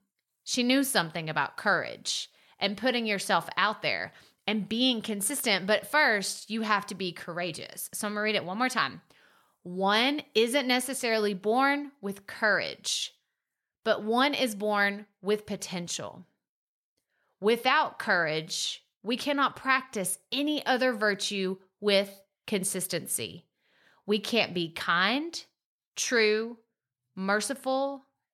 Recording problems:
none

